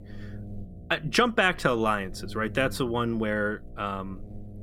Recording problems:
electrical hum; faint; throughout; 60 Hz, 25 dB below the speech

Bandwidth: 16 kHz